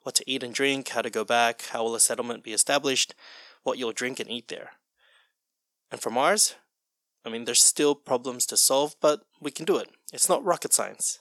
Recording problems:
thin; somewhat; fading below 550 Hz

